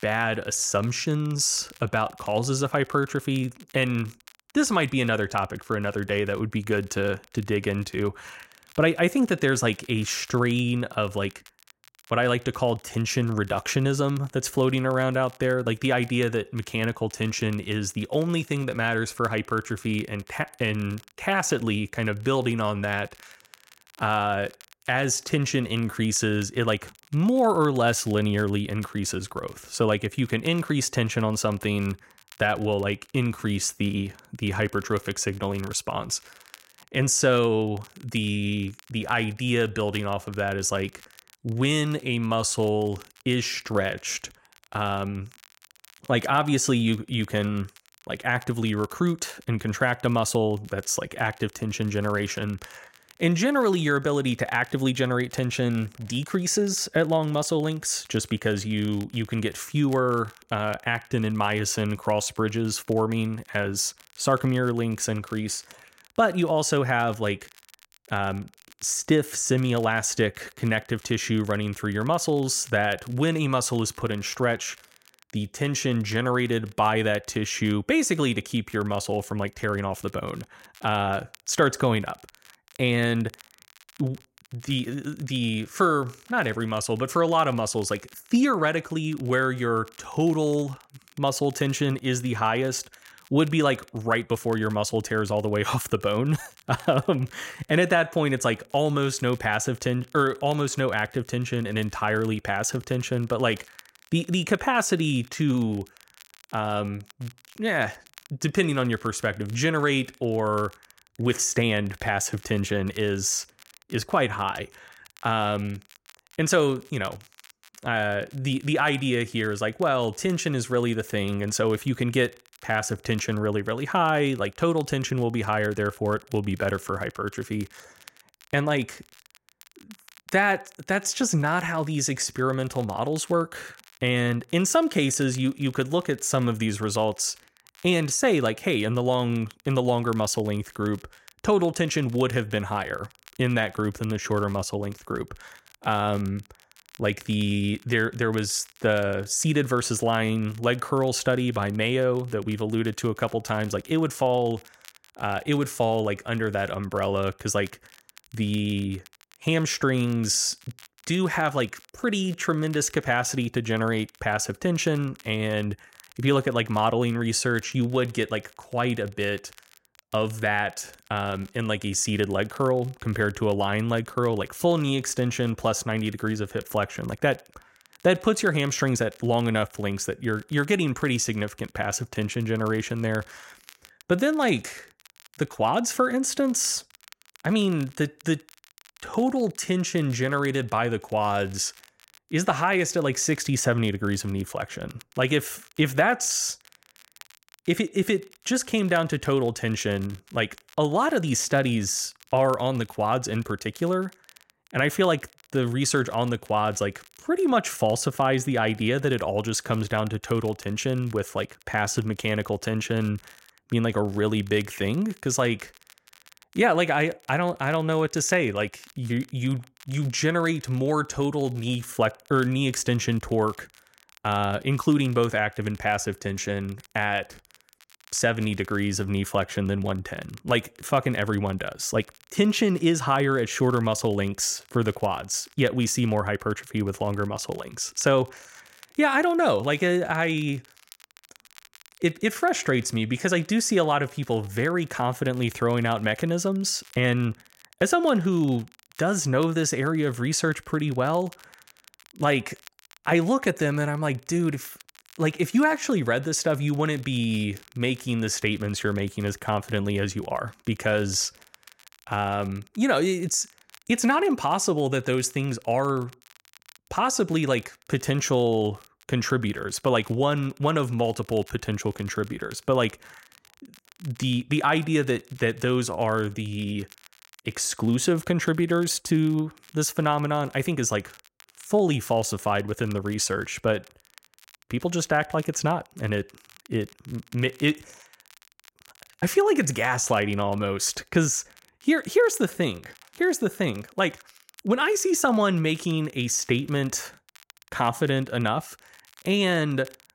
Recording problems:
crackle, like an old record; faint; 25 dB below the speech

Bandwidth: 16 kHz